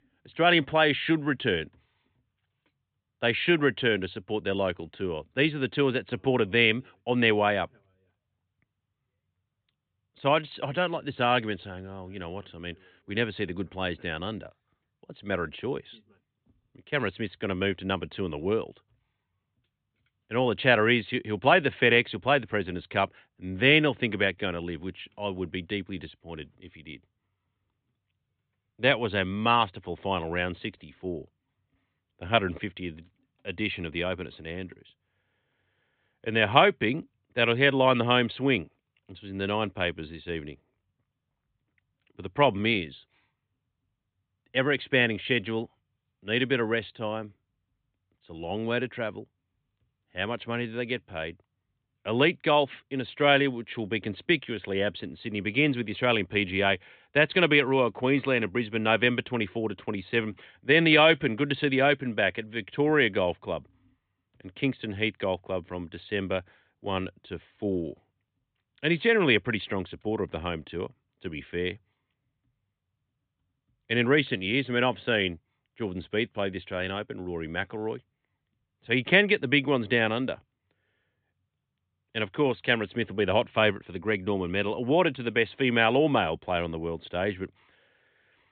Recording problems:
high frequencies cut off; severe; nothing above 4 kHz

